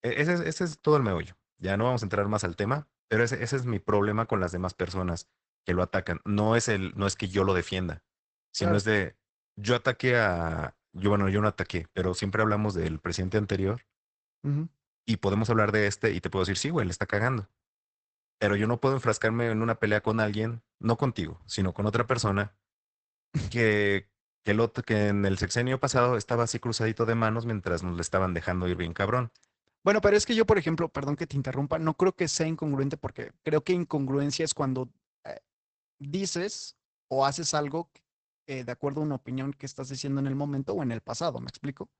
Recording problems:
garbled, watery; badly; nothing above 8 kHz

